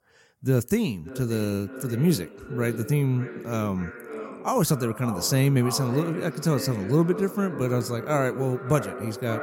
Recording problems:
echo of what is said; strong; throughout; 570 ms later, 10 dB below the speech

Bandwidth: 16.5 kHz